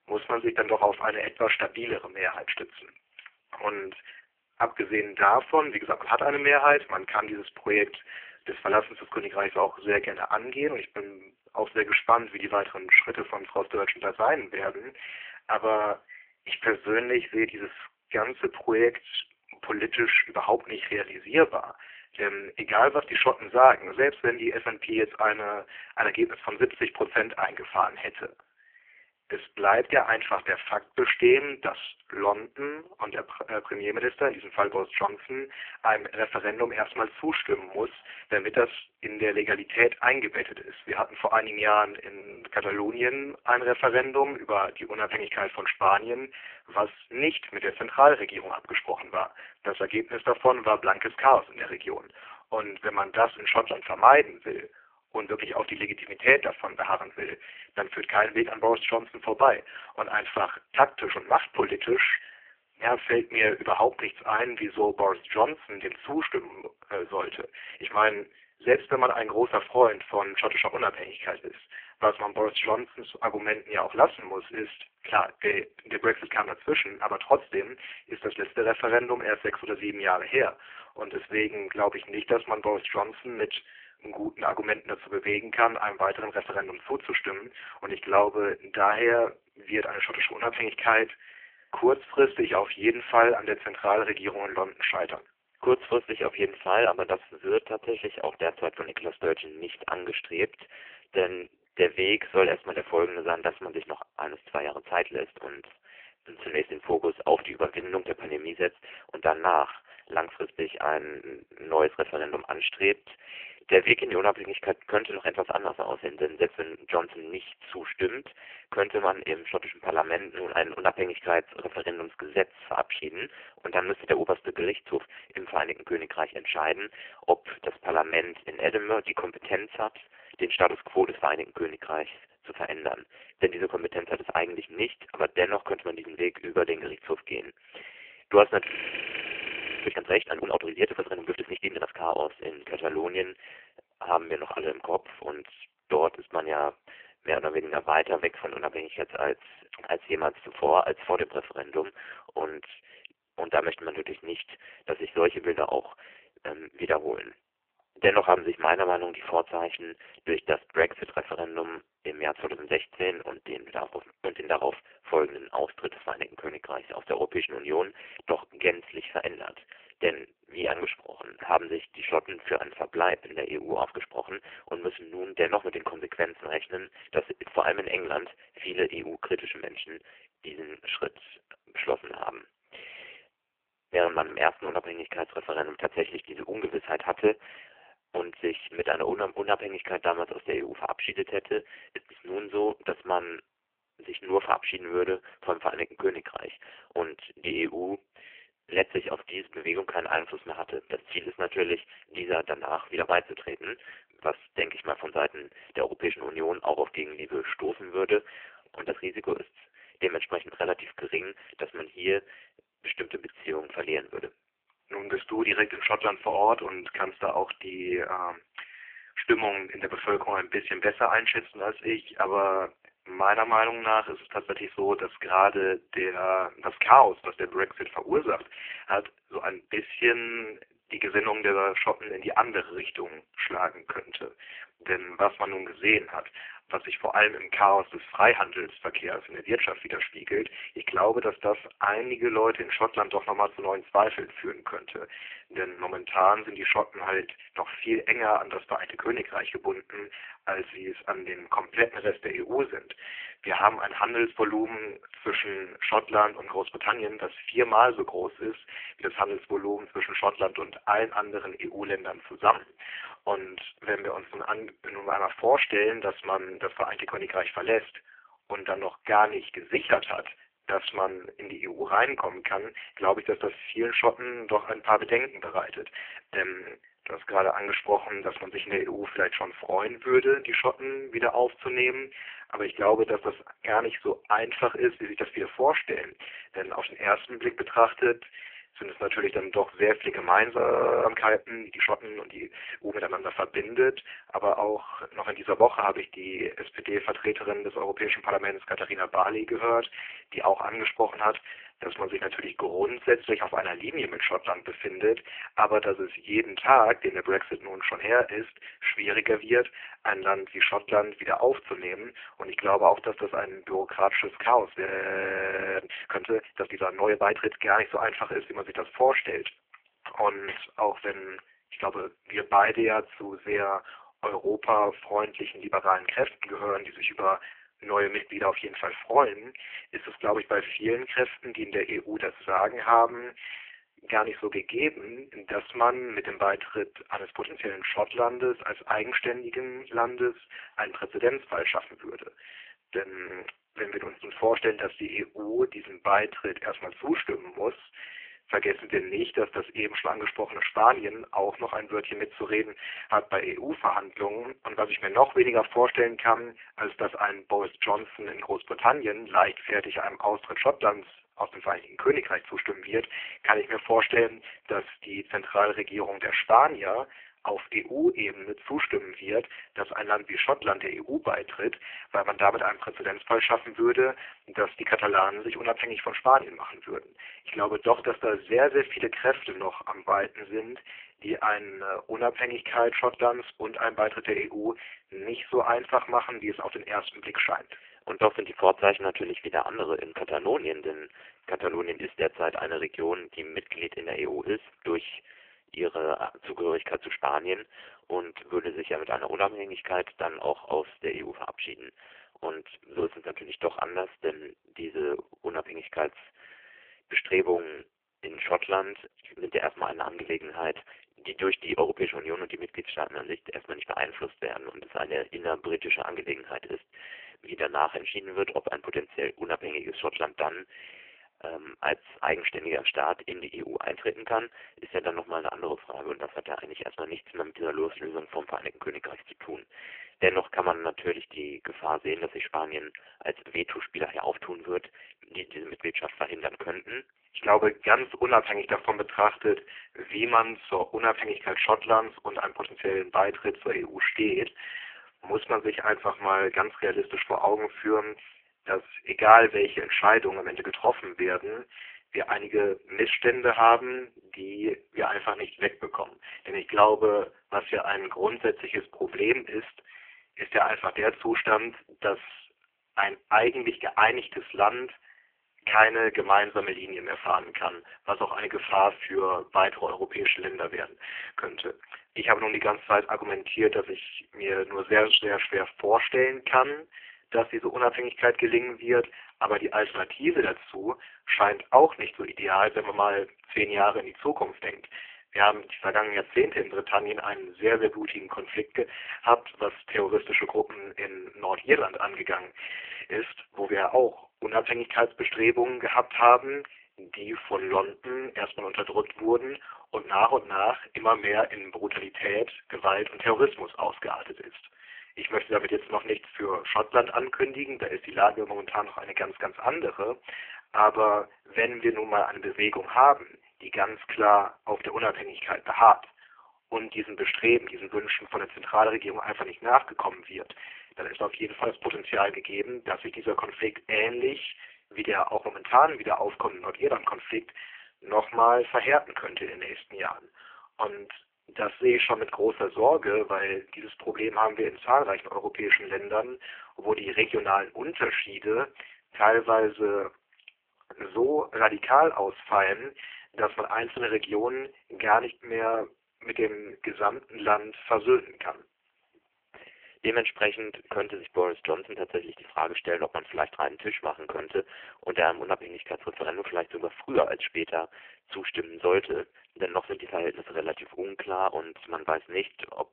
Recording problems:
phone-call audio; poor line
thin; very; fading below 350 Hz
audio freezing; at 2:19 for 1 s, at 4:51 and at 5:15 for 1 s

